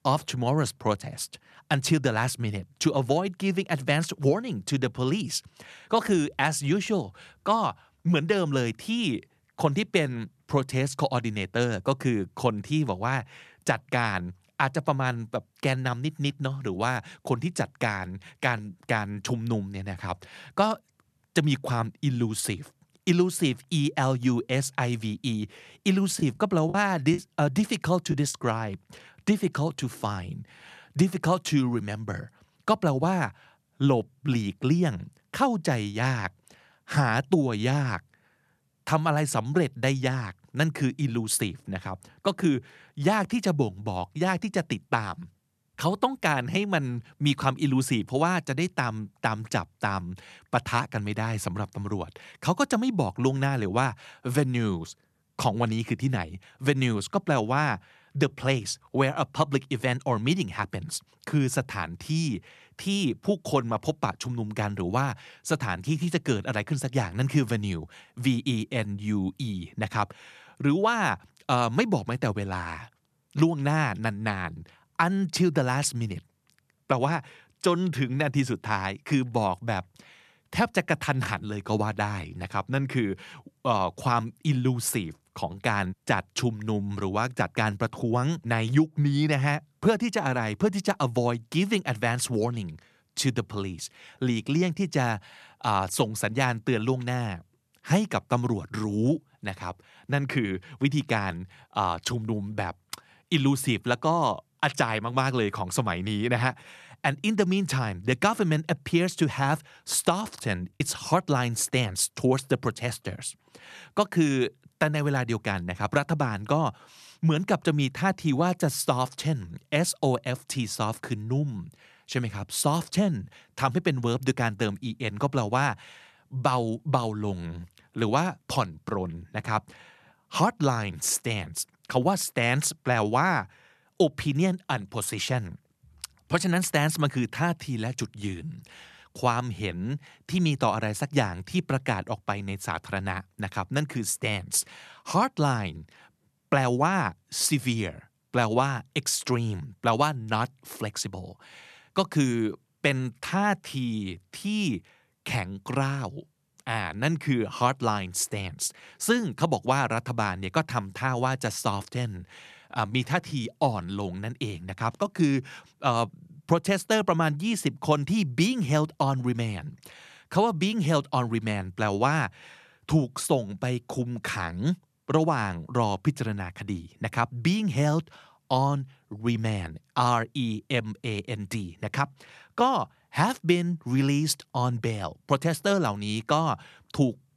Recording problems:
choppy; occasionally; from 26 to 28 s and at 1:51; 5% of the speech affected

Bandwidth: 13.5 kHz